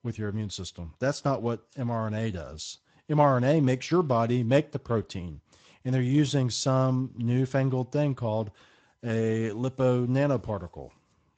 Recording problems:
garbled, watery; slightly; nothing above 7.5 kHz

